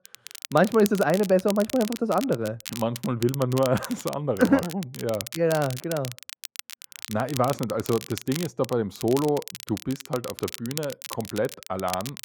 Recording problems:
muffled; slightly; fading above 2 kHz
crackle, like an old record; noticeable; 10 dB below the speech

